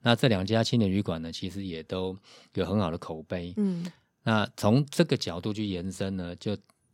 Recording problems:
none

